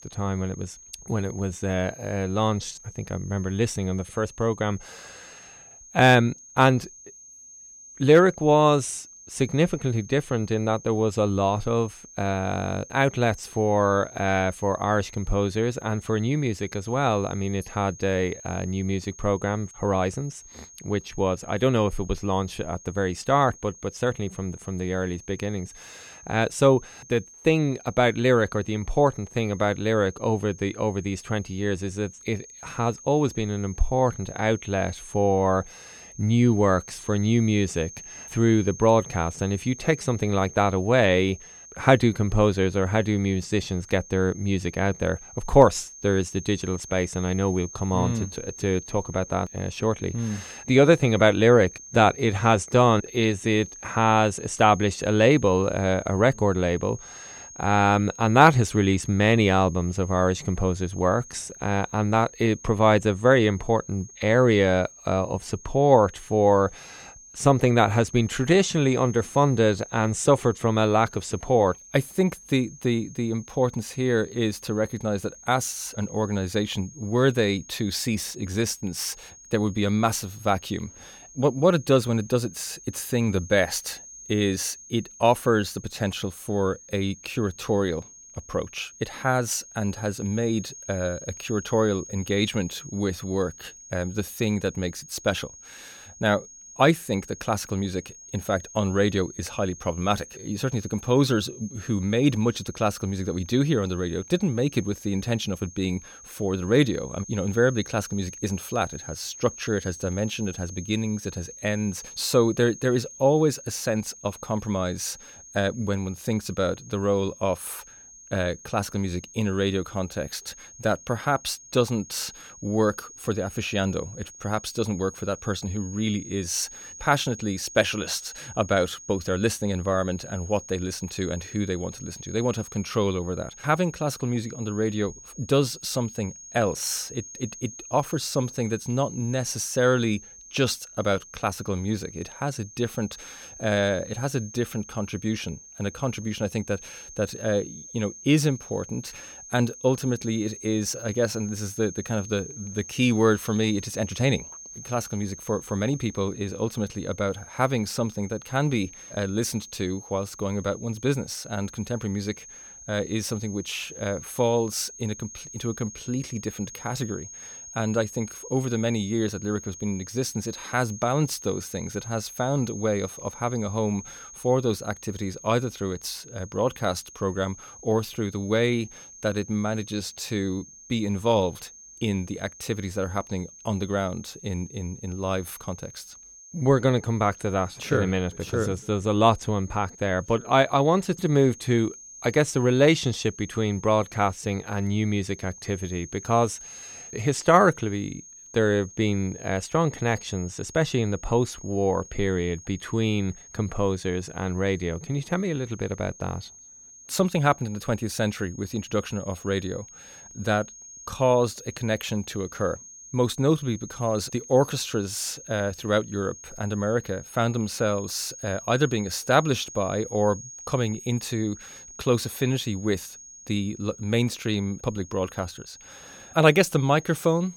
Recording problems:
high-pitched whine; noticeable; throughout; 6.5 kHz, 15 dB below the speech

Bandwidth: 17 kHz